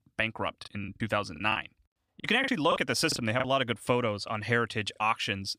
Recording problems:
choppy; very; 8% of the speech affected

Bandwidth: 15 kHz